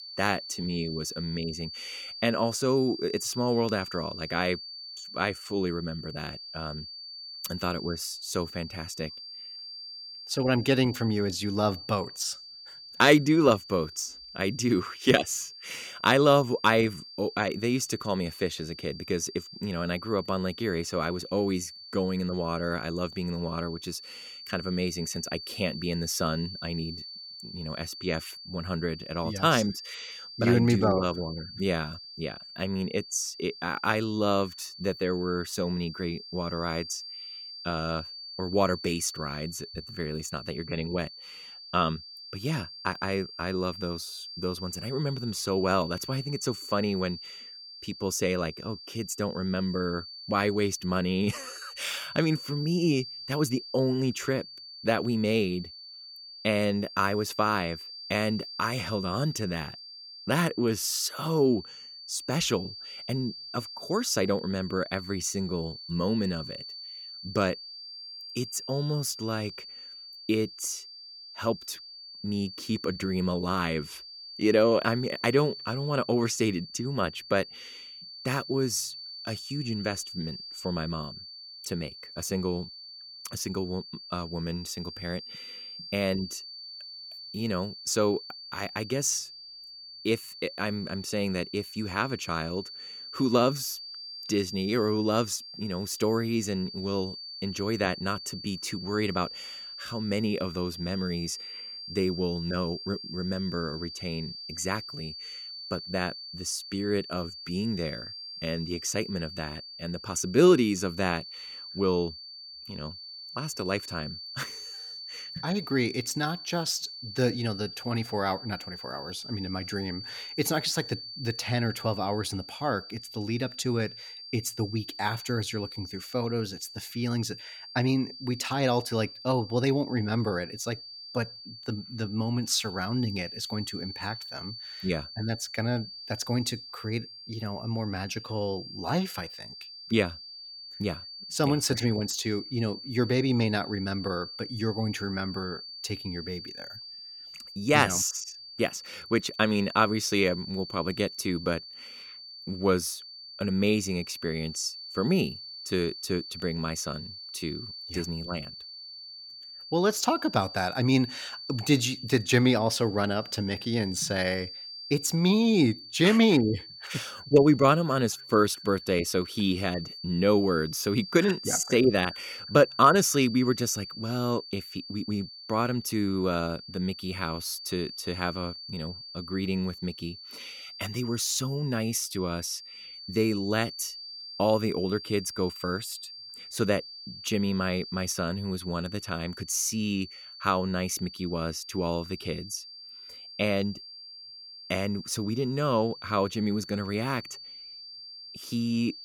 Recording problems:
high-pitched whine; noticeable; throughout; 4.5 kHz, 10 dB below the speech

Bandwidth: 17 kHz